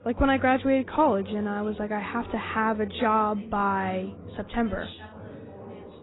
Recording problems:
garbled, watery; badly; nothing above 4 kHz
background chatter; noticeable; throughout; 4 voices, 15 dB below the speech

